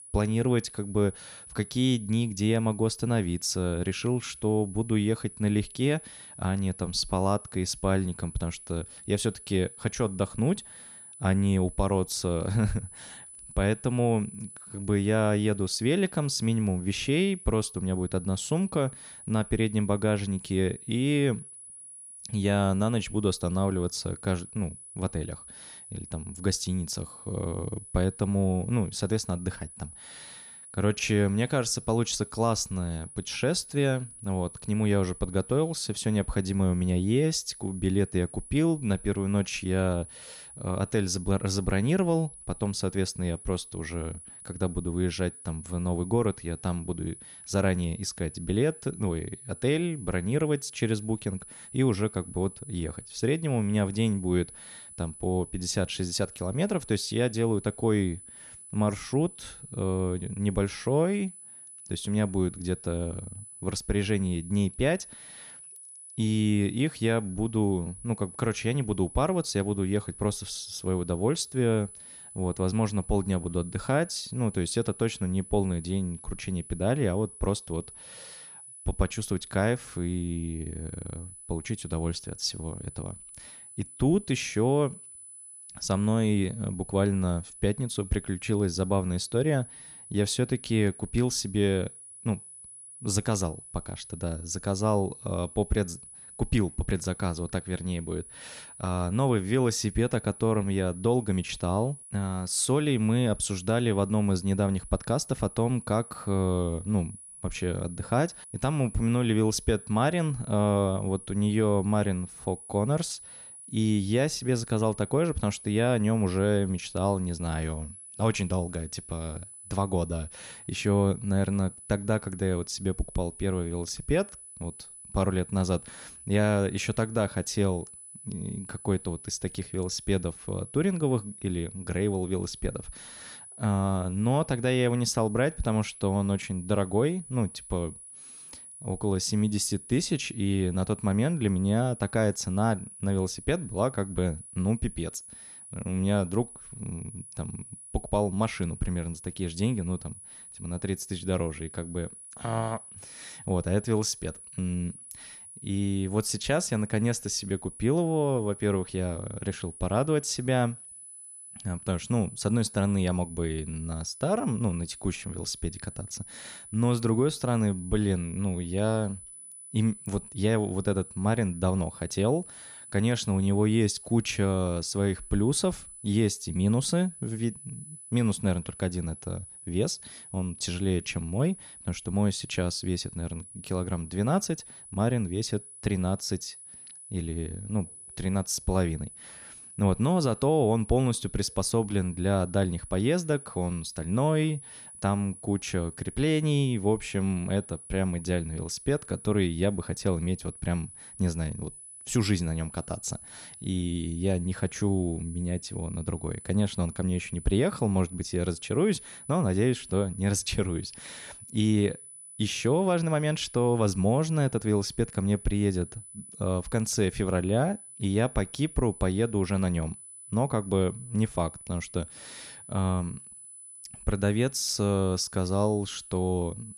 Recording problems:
high-pitched whine; noticeable; throughout; 10 kHz, 15 dB below the speech

